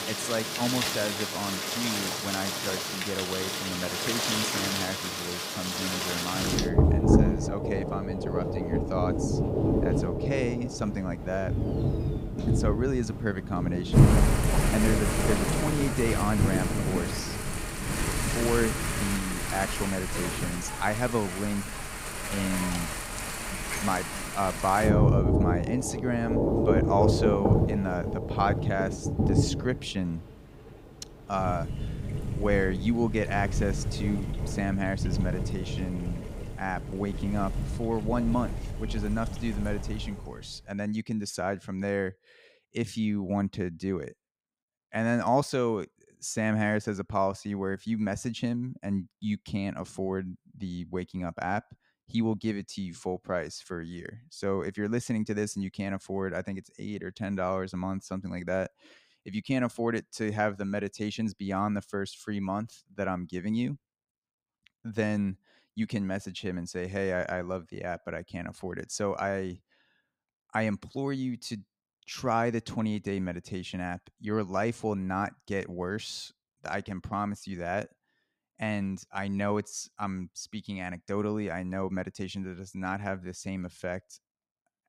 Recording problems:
rain or running water; very loud; until 40 s; 3 dB above the speech

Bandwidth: 15.5 kHz